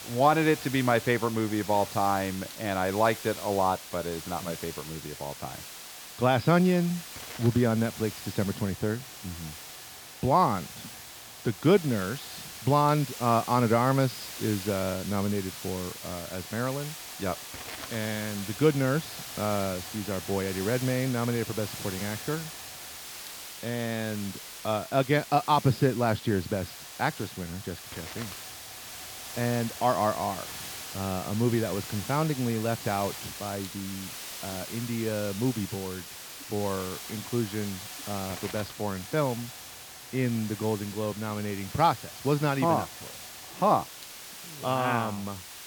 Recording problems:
high frequencies cut off; noticeable; nothing above 5.5 kHz
hiss; noticeable; throughout; 10 dB below the speech

